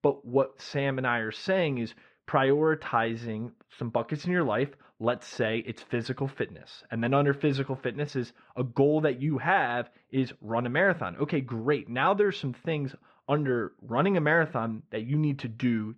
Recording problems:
muffled; very; fading above 1.5 kHz

